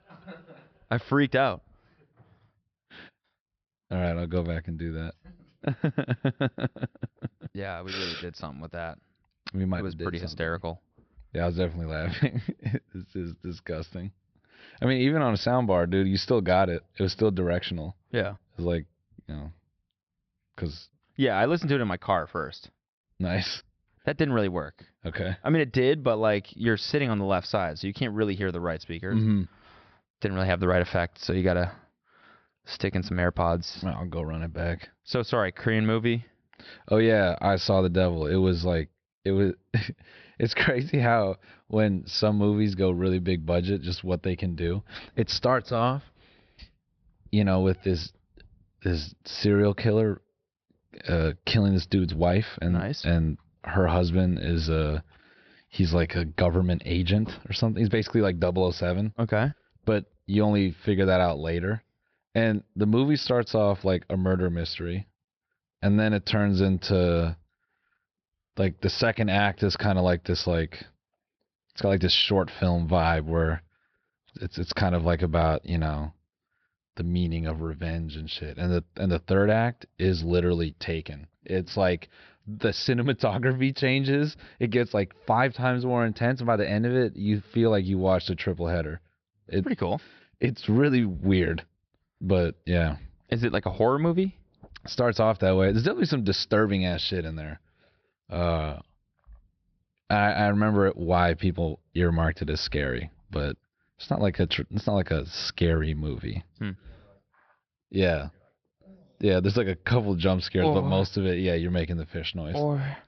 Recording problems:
high frequencies cut off; noticeable; nothing above 5.5 kHz

